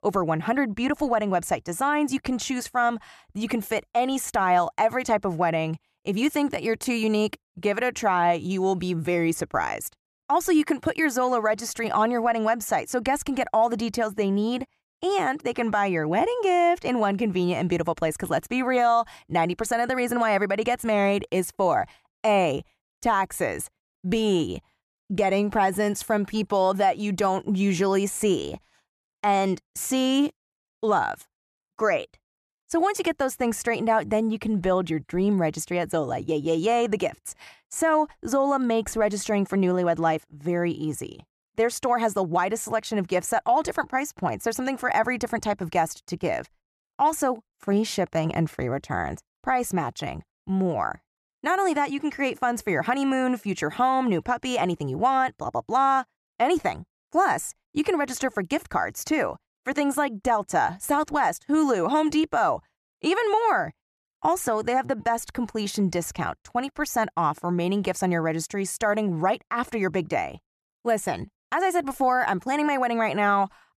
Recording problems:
none

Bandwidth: 13.5 kHz